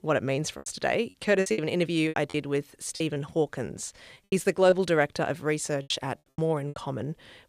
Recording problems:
choppy; very; 12% of the speech affected

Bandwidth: 14.5 kHz